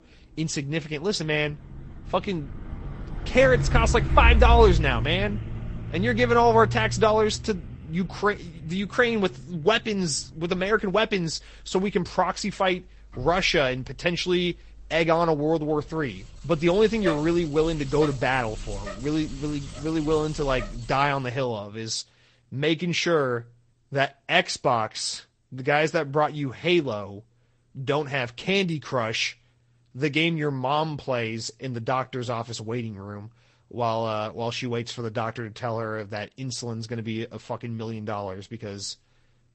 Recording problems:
garbled, watery; slightly; nothing above 8.5 kHz
traffic noise; loud; until 21 s; 5 dB below the speech

